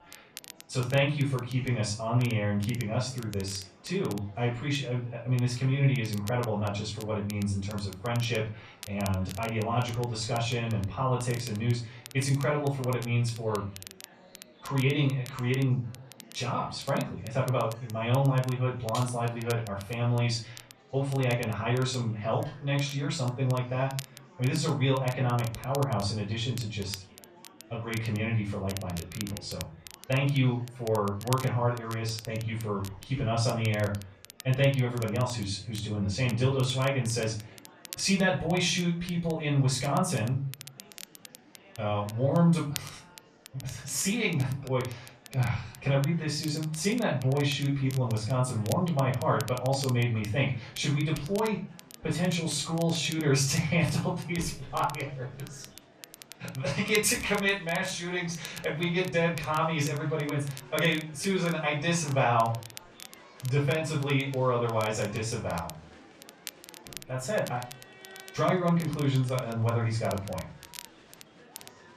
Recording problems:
off-mic speech; far
room echo; slight; dies away in 0.3 s
crackle, like an old record; noticeable; 20 dB below the speech
murmuring crowd; faint; throughout; 25 dB below the speech

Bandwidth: 14 kHz